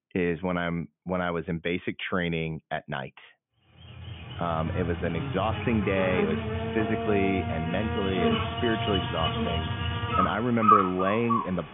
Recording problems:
high frequencies cut off; severe; nothing above 3.5 kHz
animal sounds; very loud; from 4 s on; 1 dB above the speech

